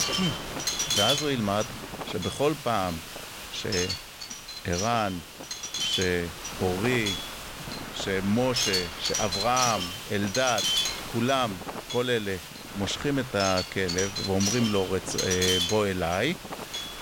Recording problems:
wind noise on the microphone; heavy; 1 dB below the speech
hiss; noticeable; throughout; 10 dB below the speech

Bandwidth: 16.5 kHz